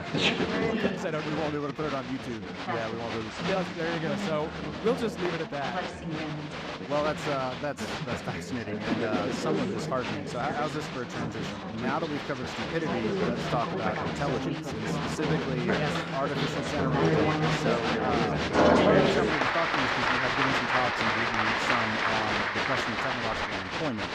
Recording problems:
crowd noise; very loud; throughout; 5 dB above the speech

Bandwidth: 15 kHz